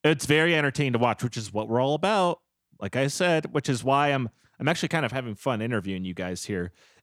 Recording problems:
none

